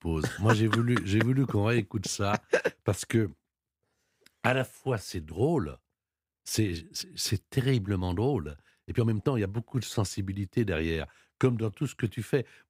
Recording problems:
uneven, jittery; strongly; from 2 to 12 s

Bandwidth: 15.5 kHz